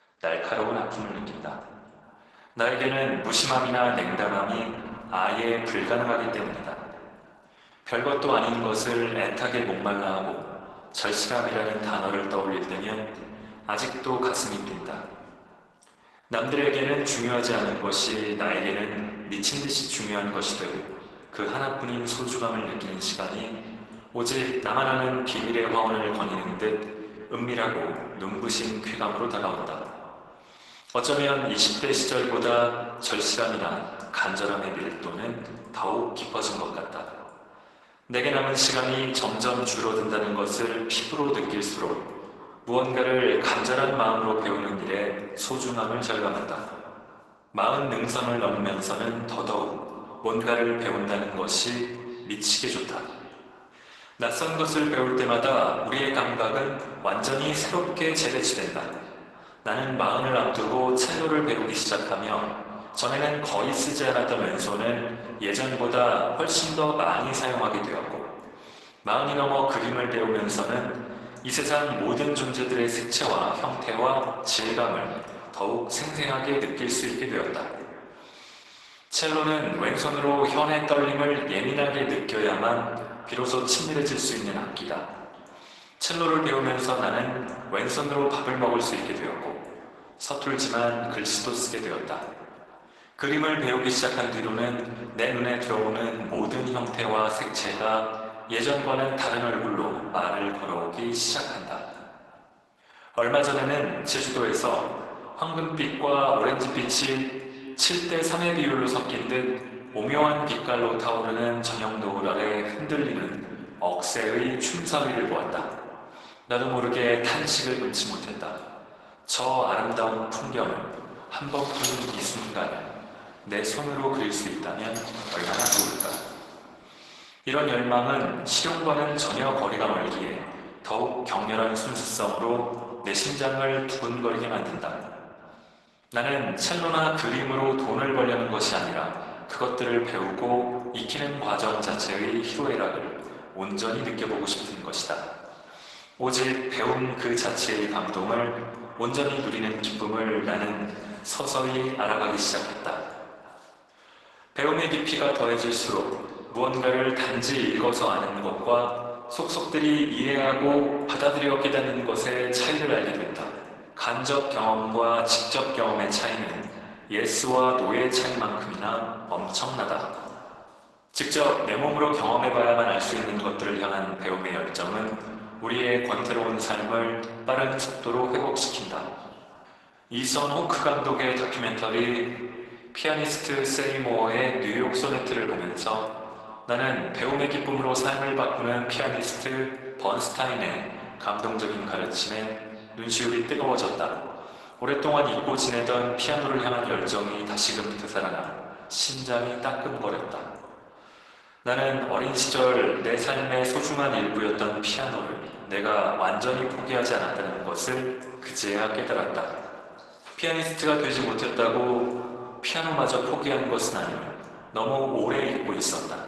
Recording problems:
garbled, watery; badly; nothing above 12 kHz
thin; somewhat; fading below 400 Hz
echo of what is said; faint; throughout; 570 ms later, 20 dB below the speech
room echo; slight; dies away in 1.3 s
off-mic speech; somewhat distant
uneven, jittery; slightly; from 25 s to 3:19
door banging; loud; from 2:02 to 2:06; peak 4 dB above the speech

